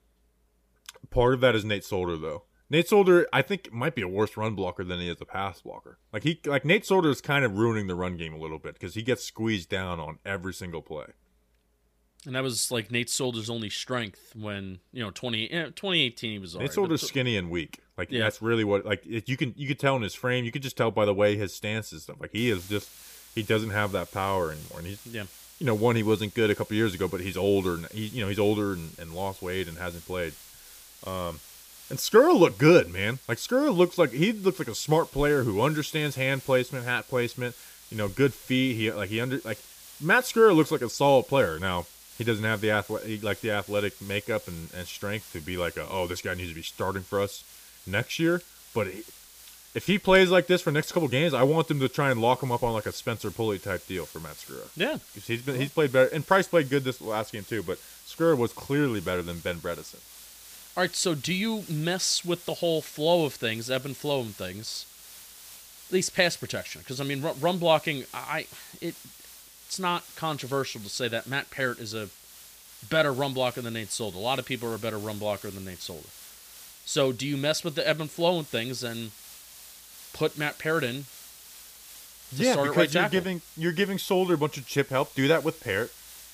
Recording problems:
hiss; noticeable; from 22 s on; 20 dB below the speech

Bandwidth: 15 kHz